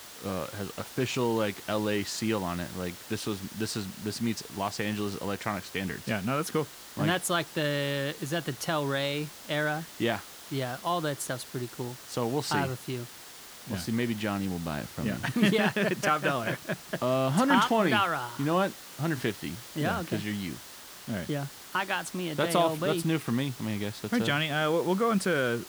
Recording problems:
hiss; noticeable; throughout; 15 dB below the speech

